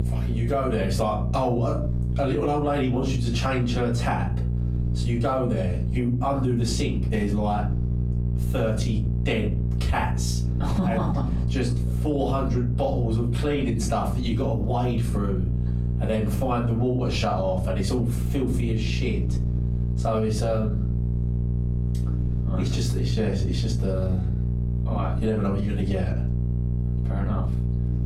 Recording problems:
off-mic speech; far
room echo; slight; dies away in 0.3 s
squashed, flat; somewhat
electrical hum; noticeable; throughout; 60 Hz, 10 dB below the speech

